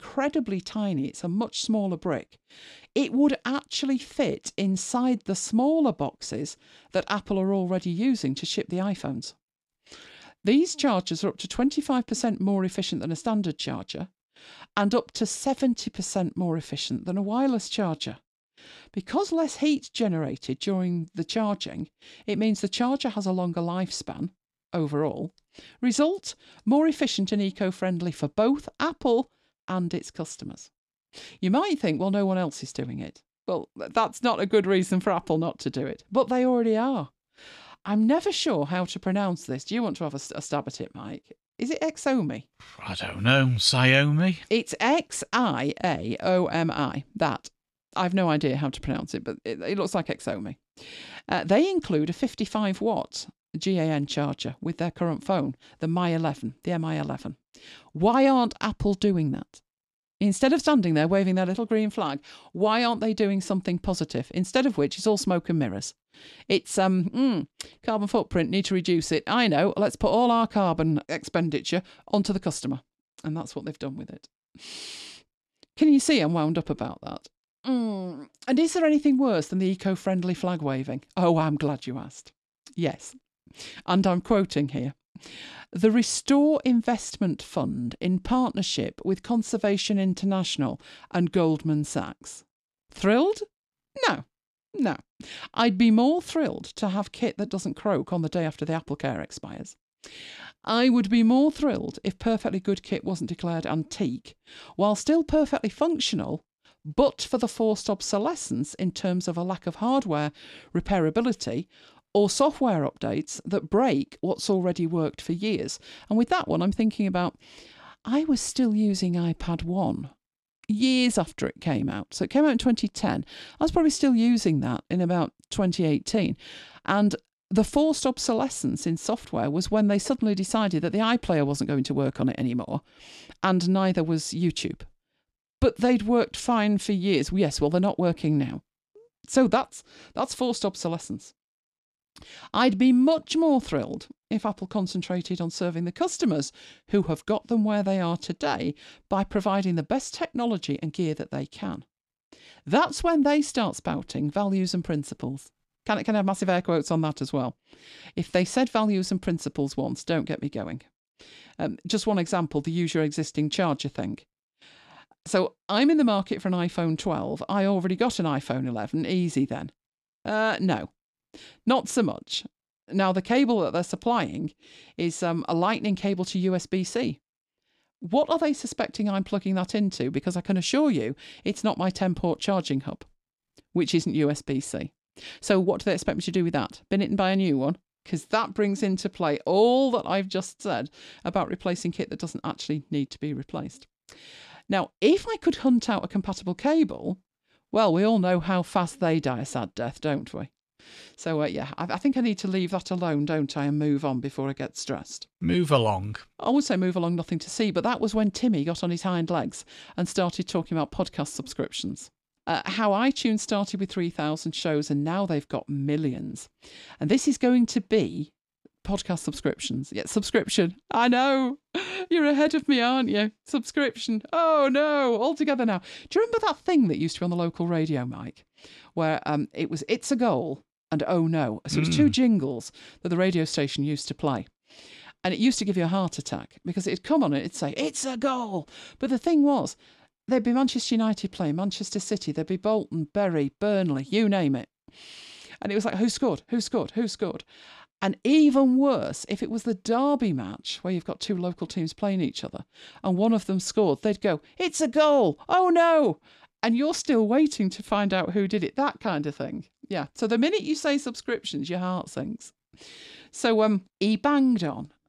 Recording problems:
none

